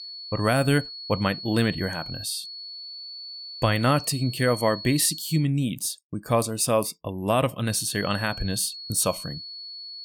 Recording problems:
high-pitched whine; noticeable; until 5.5 s and from 7.5 s on; 4.5 kHz, 10 dB below the speech

